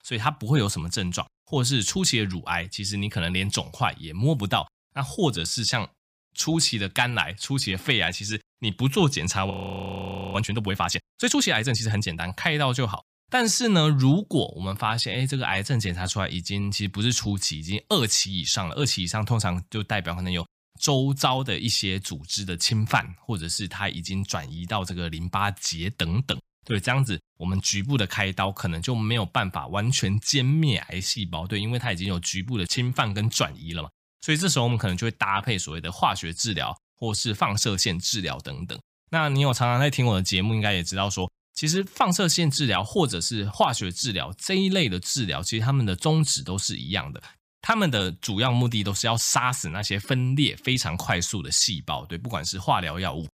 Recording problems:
audio freezing; at 9.5 s for 1 s

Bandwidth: 15 kHz